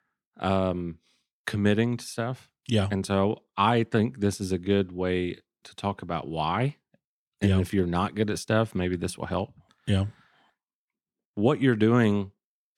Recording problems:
none

